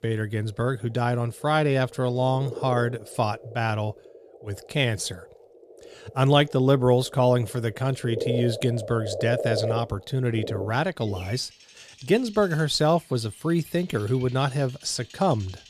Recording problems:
animal sounds; noticeable; throughout; 10 dB below the speech

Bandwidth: 14.5 kHz